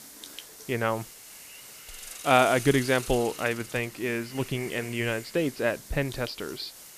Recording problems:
high frequencies cut off; noticeable; nothing above 5.5 kHz
hiss; noticeable; throughout; 15 dB below the speech

